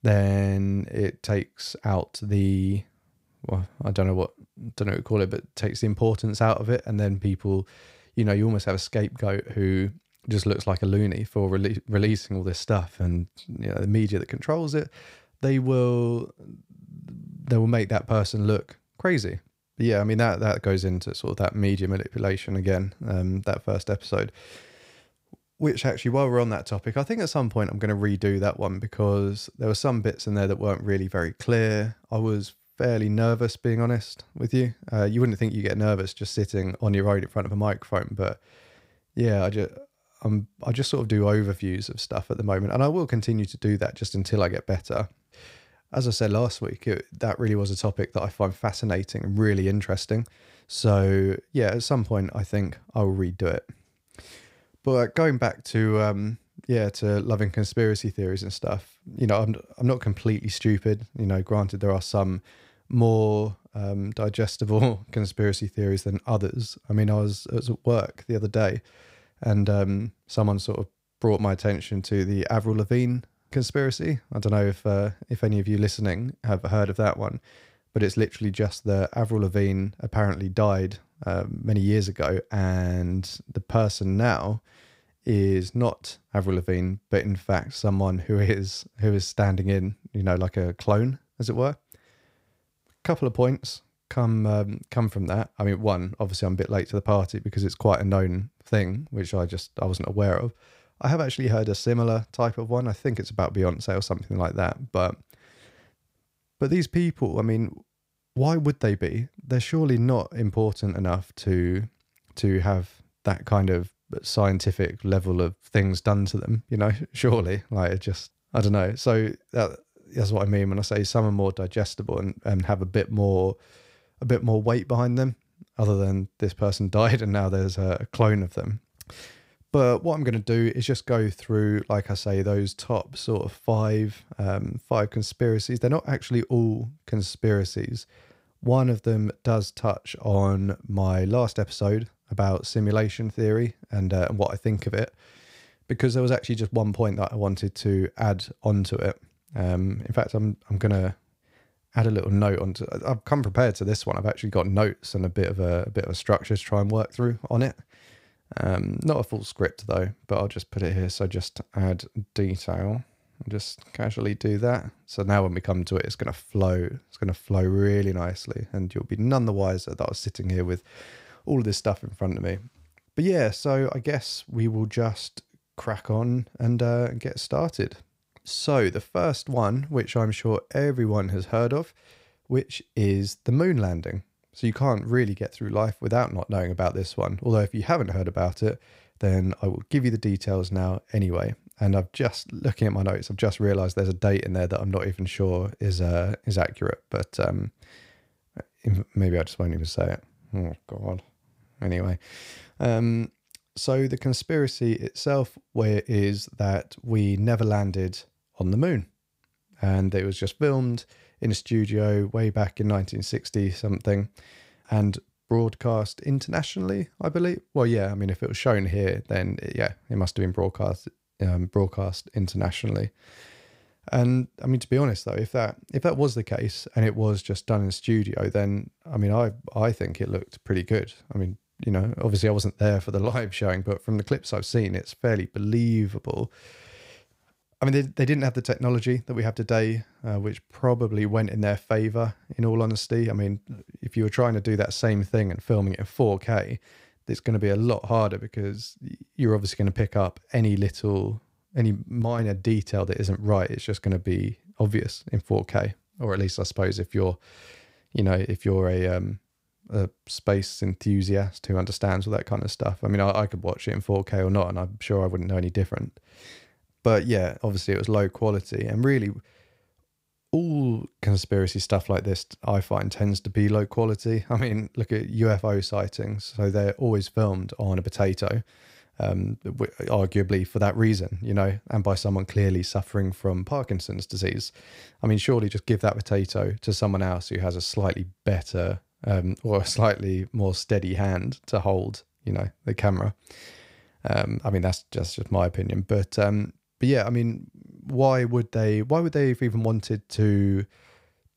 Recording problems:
none

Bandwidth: 15.5 kHz